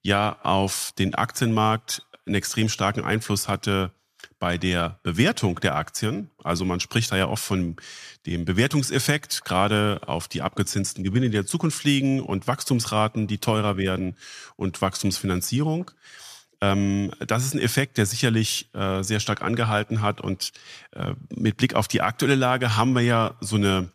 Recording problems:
none

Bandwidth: 14.5 kHz